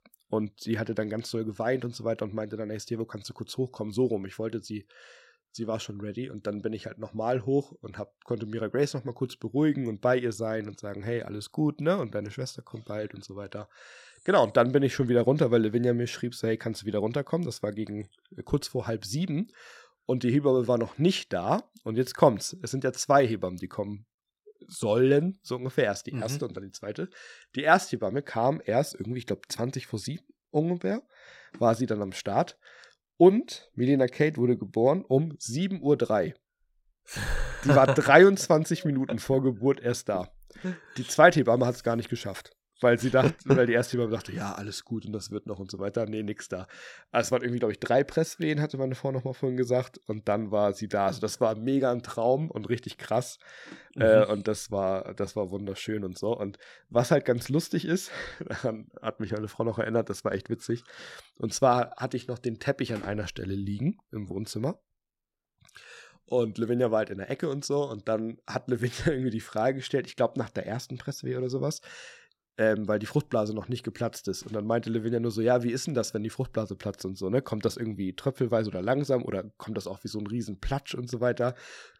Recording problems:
none

